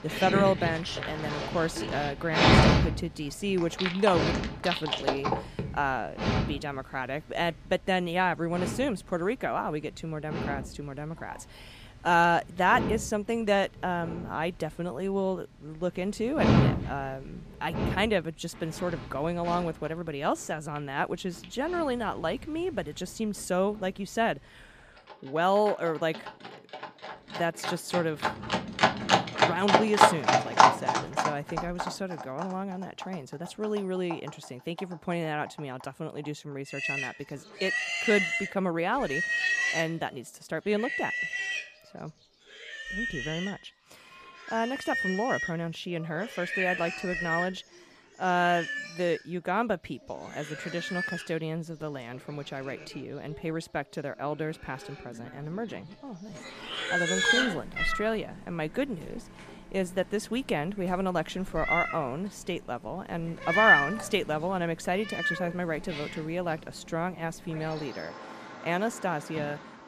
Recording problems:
animal sounds; very loud; throughout; 2 dB above the speech

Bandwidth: 15 kHz